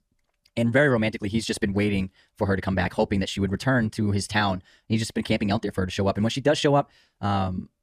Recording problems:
wrong speed, natural pitch; too fast; 1.5 times normal speed

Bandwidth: 14.5 kHz